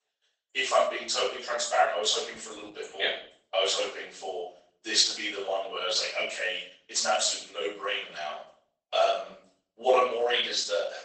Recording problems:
off-mic speech; far
garbled, watery; badly; nothing above 8 kHz
thin; very; fading below 500 Hz
room echo; noticeable; dies away in 0.5 s

